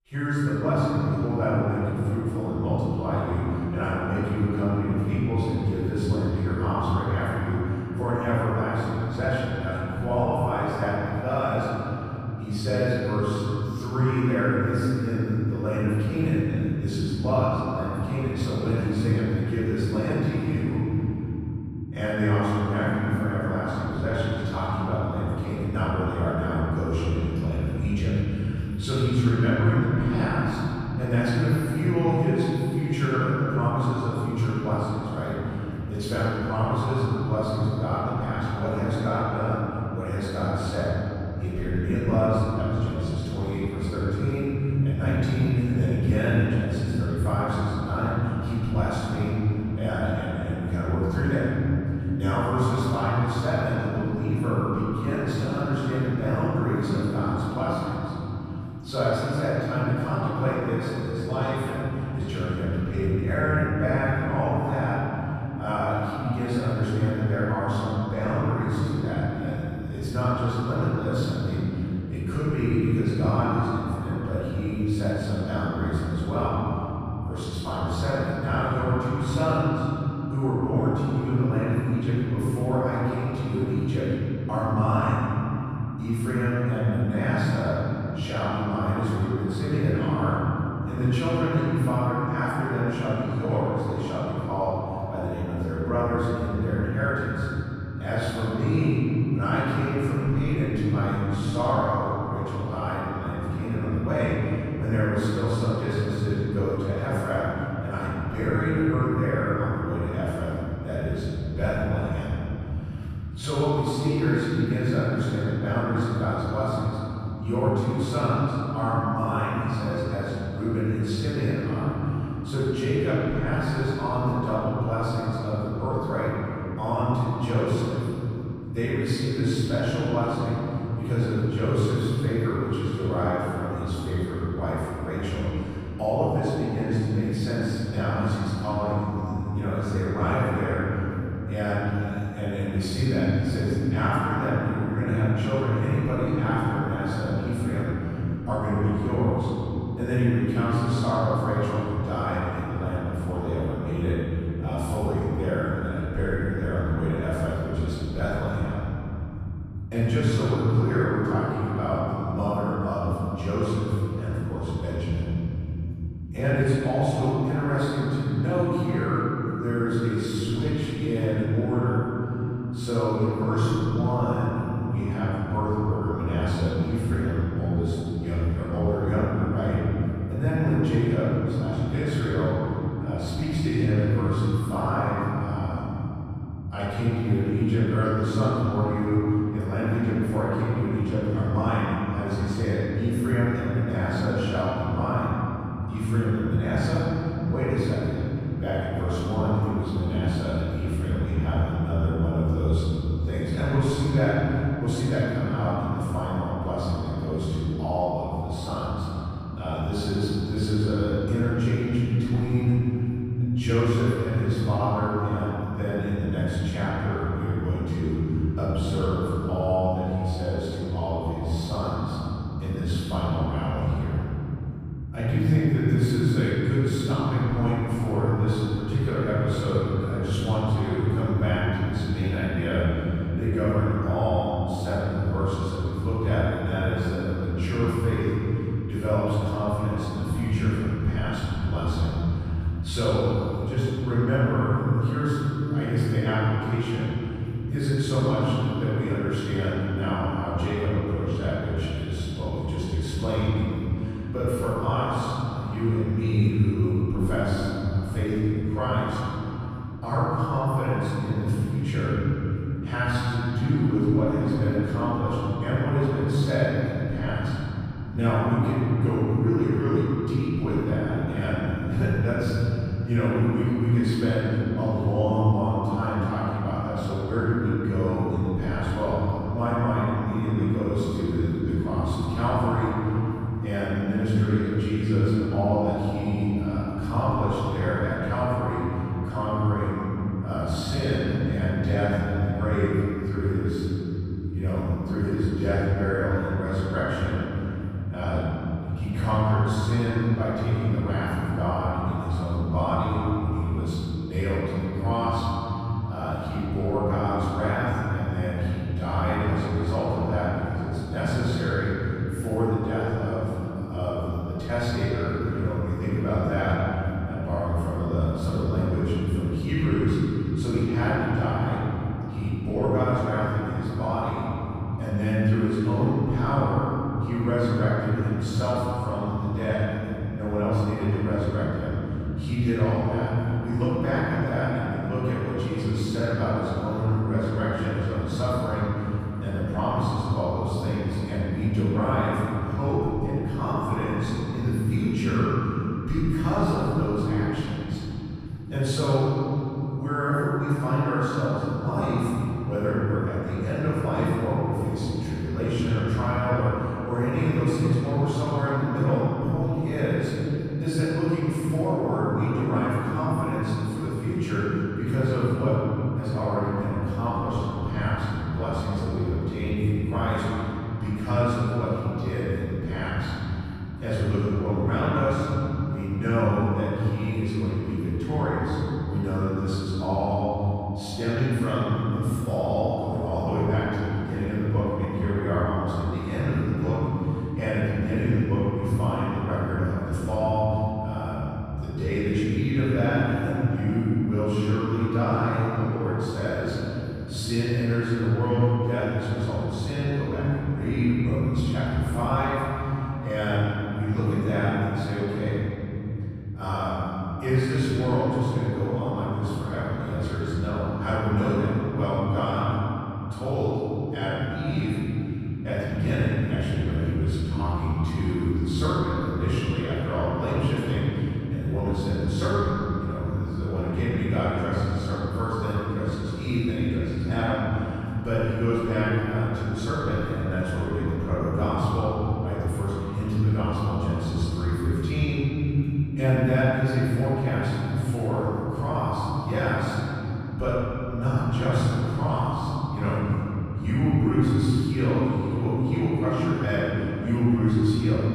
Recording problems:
room echo; strong; dies away in 3 s
off-mic speech; far

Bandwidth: 14.5 kHz